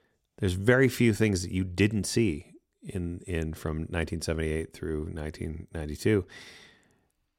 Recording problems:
none

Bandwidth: 16 kHz